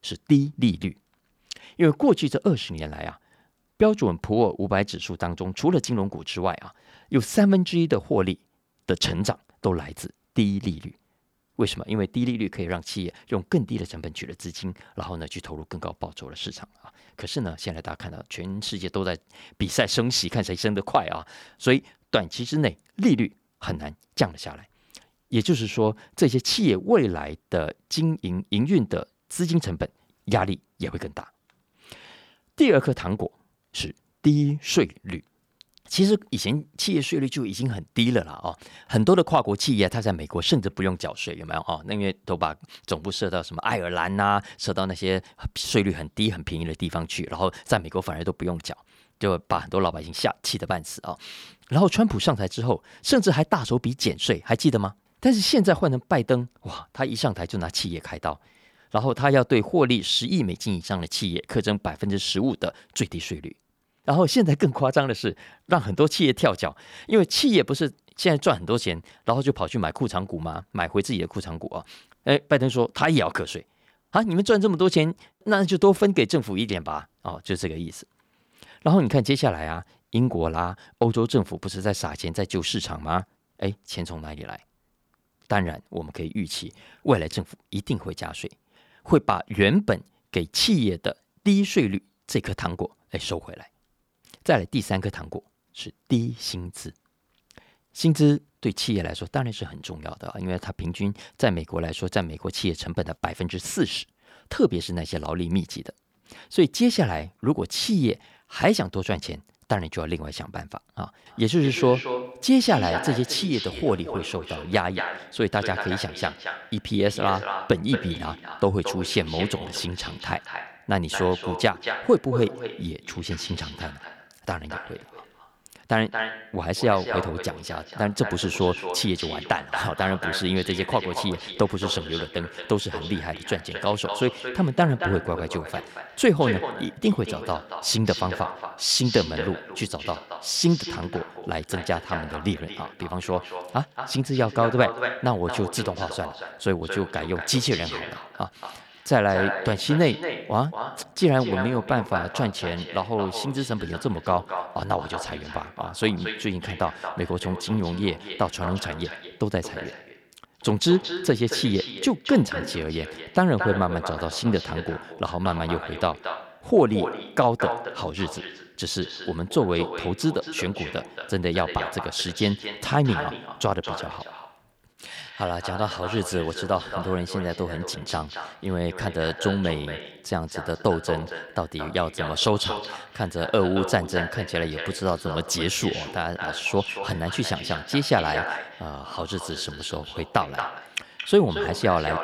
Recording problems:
echo of what is said; strong; from 1:51 on; 230 ms later, 9 dB below the speech

